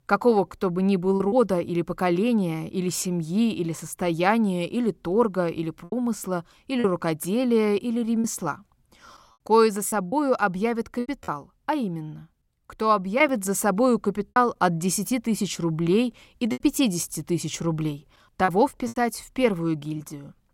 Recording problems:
choppy; occasionally; 4% of the speech affected

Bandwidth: 16.5 kHz